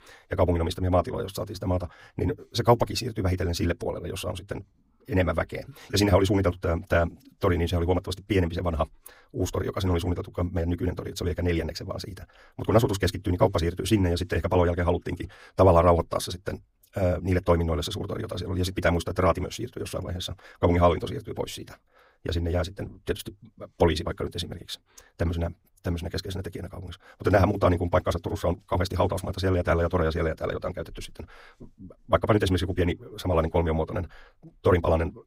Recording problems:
wrong speed, natural pitch; too fast; 1.7 times normal speed

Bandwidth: 15.5 kHz